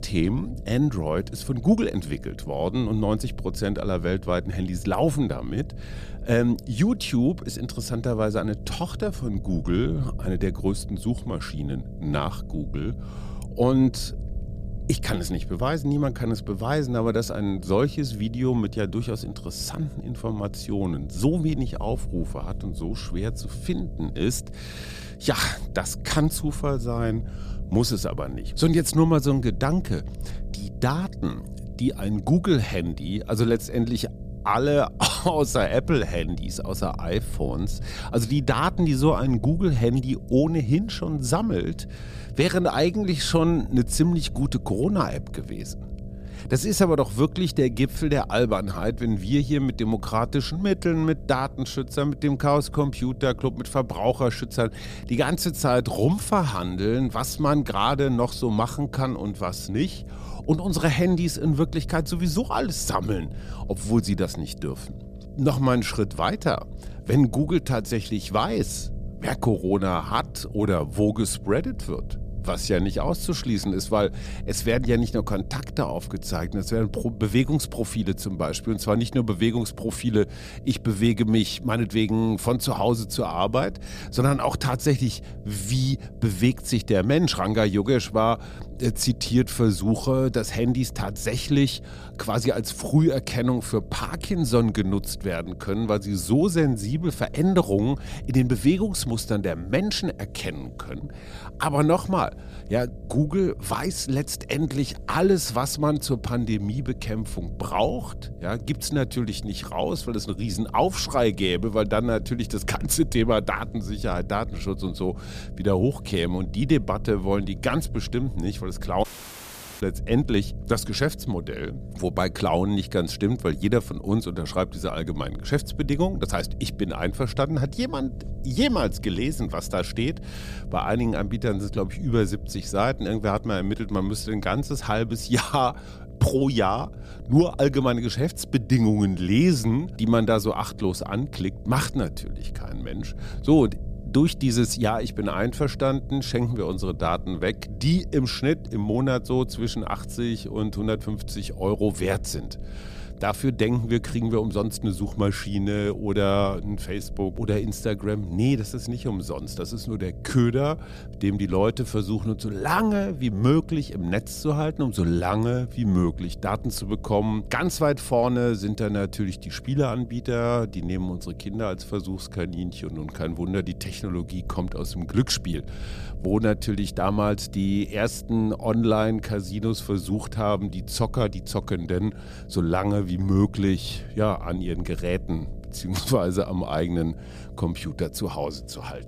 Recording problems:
electrical hum; faint; throughout; 60 Hz, 25 dB below the speech
low rumble; faint; throughout; 25 dB below the speech
audio cutting out; at 1:59 for 1 s

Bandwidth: 14.5 kHz